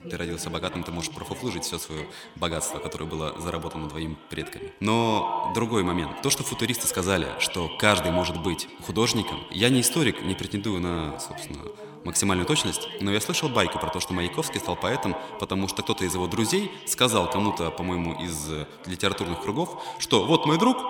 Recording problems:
echo of what is said; strong; throughout; 80 ms later, 9 dB below the speech
background chatter; noticeable; throughout; 2 voices, 15 dB below the speech

